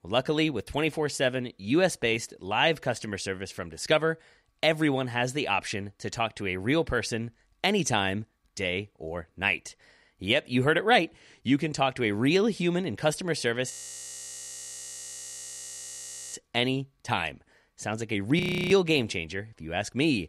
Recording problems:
audio freezing; at 14 s for 2.5 s and at 18 s

